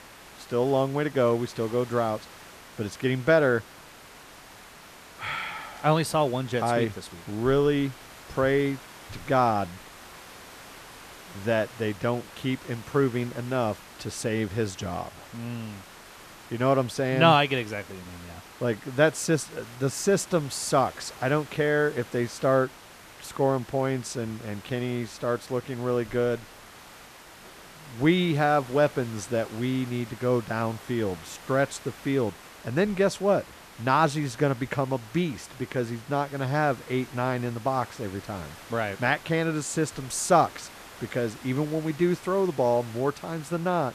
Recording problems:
hiss; noticeable; throughout; 20 dB below the speech

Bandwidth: 14.5 kHz